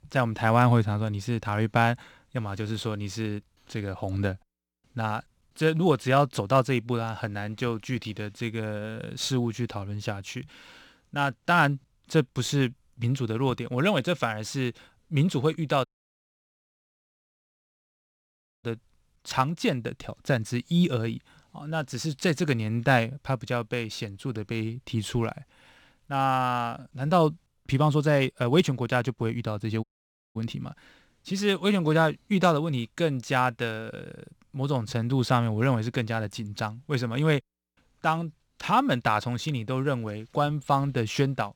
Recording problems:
audio cutting out; at 16 s for 3 s and at 30 s for 0.5 s

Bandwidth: 18.5 kHz